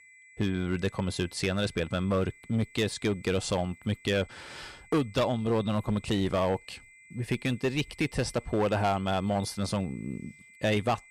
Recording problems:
distortion; slight; 5% of the sound clipped
high-pitched whine; faint; throughout; 2 kHz, 25 dB below the speech

